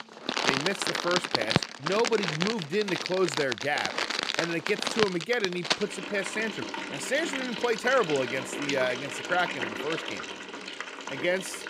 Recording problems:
household noises; loud; throughout; 1 dB below the speech

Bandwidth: 15 kHz